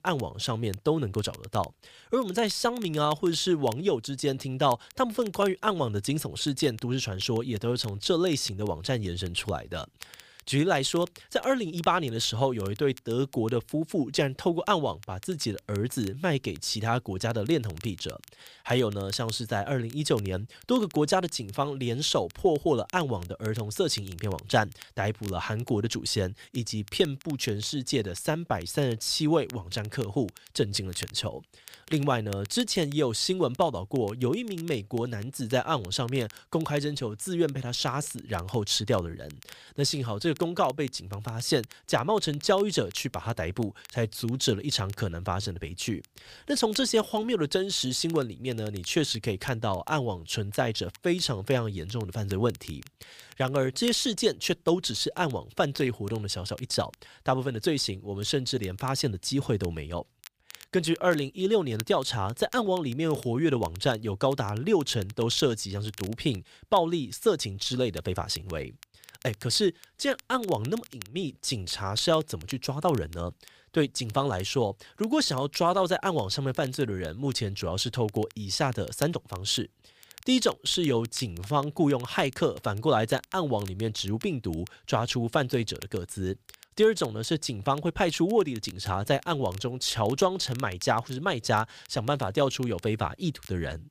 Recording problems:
crackle, like an old record; faint; 20 dB below the speech

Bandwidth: 15 kHz